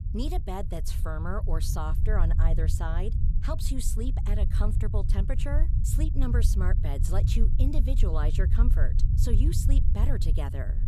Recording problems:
low rumble; loud; throughout; 7 dB below the speech

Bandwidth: 14.5 kHz